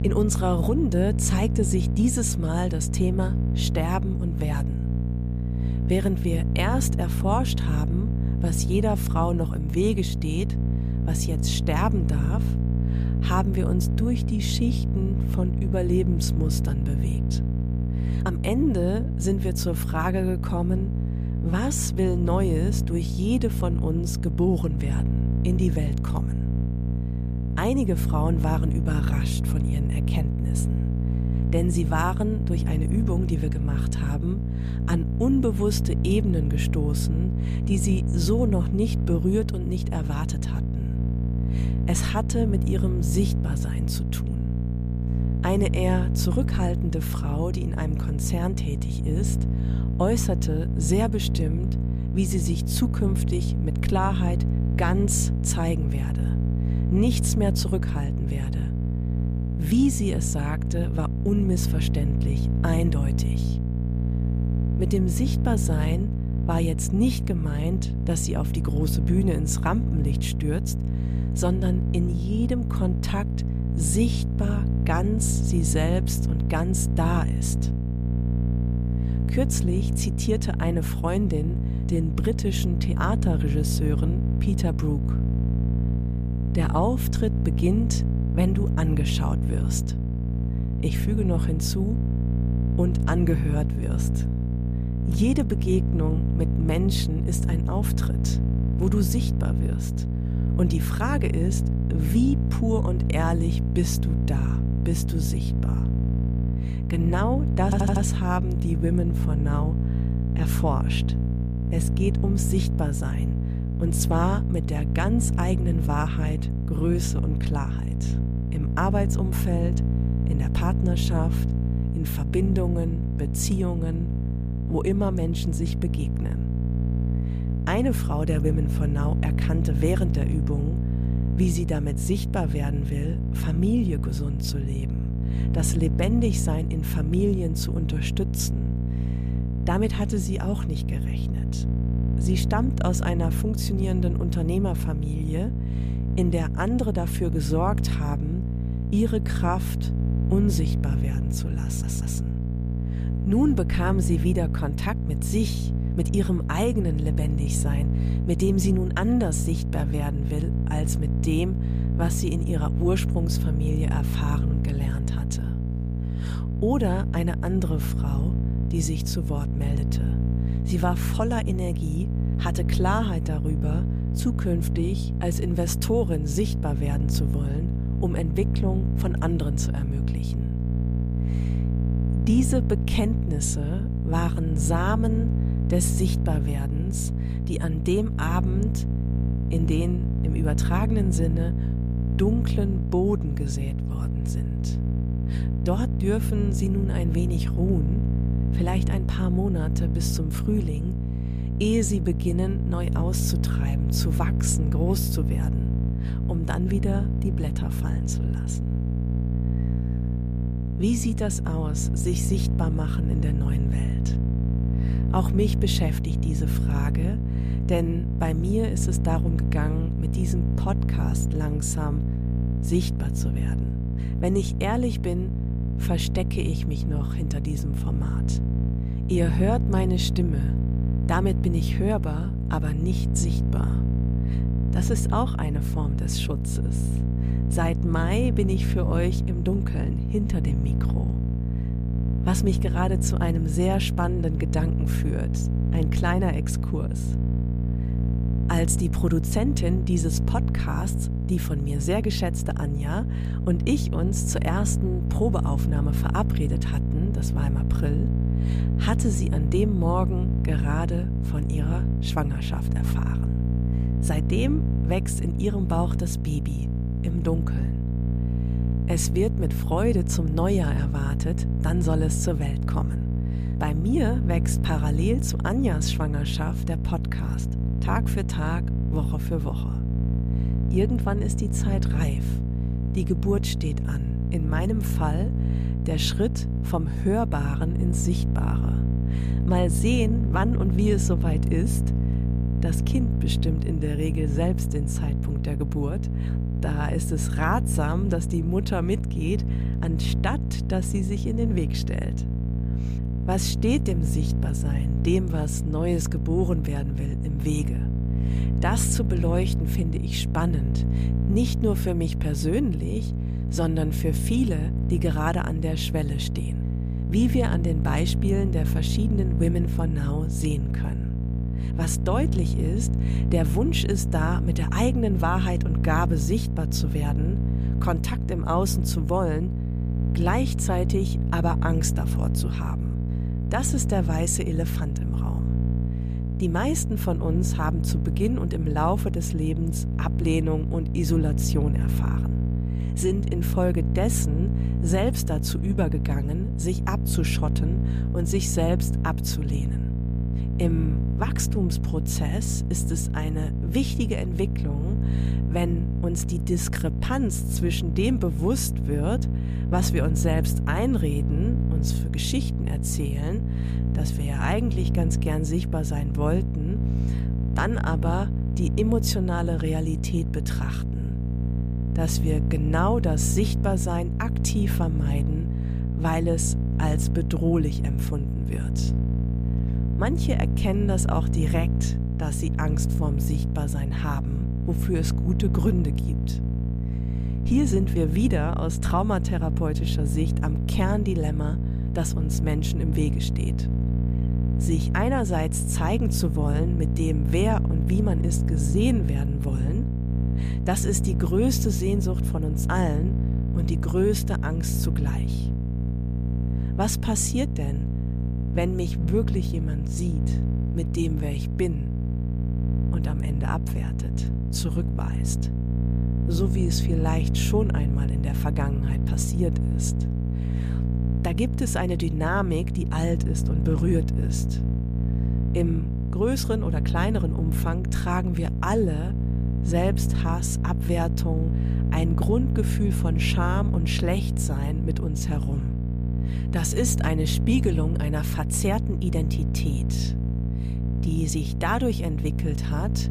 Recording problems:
electrical hum; loud; throughout; 60 Hz, 6 dB below the speech
audio stuttering; at 1:48 and at 2:32

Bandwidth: 14.5 kHz